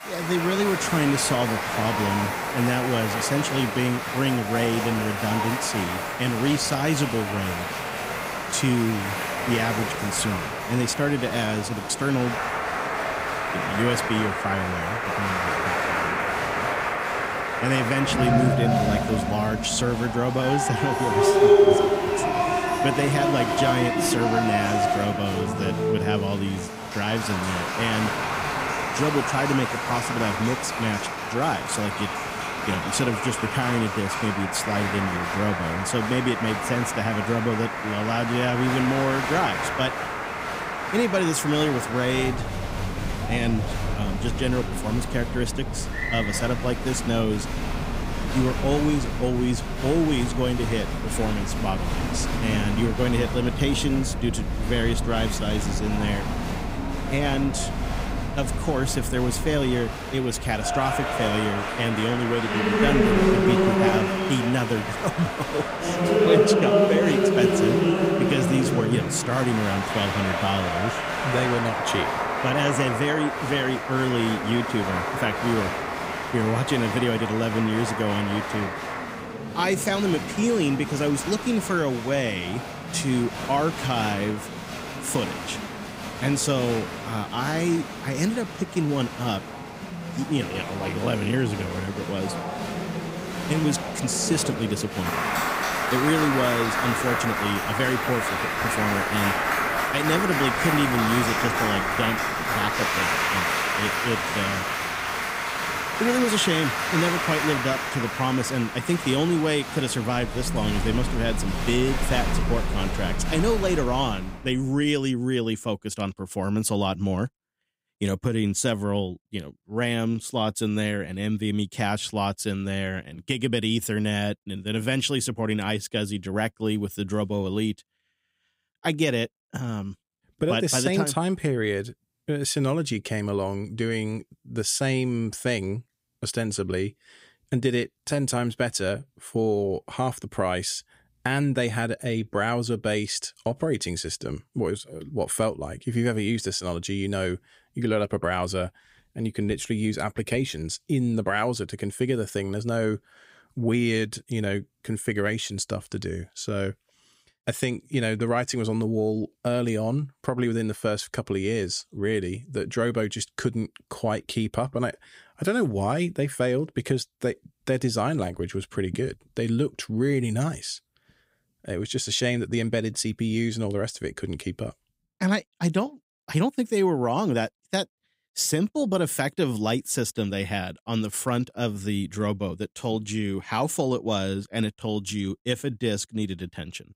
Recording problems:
crowd noise; loud; until 1:54; as loud as the speech

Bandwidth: 15.5 kHz